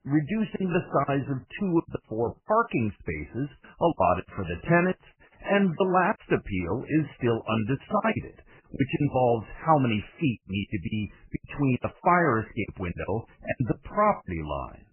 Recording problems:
garbled, watery; badly; nothing above 3 kHz
choppy; very; 13% of the speech affected

